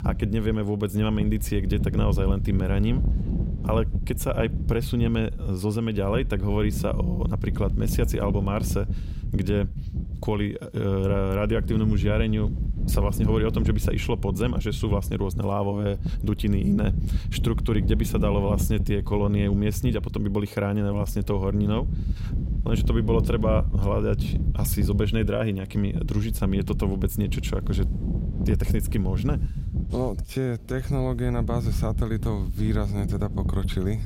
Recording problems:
wind noise on the microphone; occasional gusts; 10 dB below the speech

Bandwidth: 16 kHz